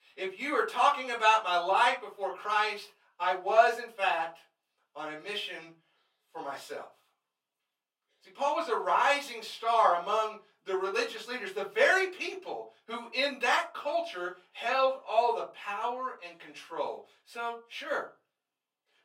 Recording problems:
off-mic speech; far
thin; somewhat; fading below 600 Hz
room echo; very slight; dies away in 0.2 s

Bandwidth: 16 kHz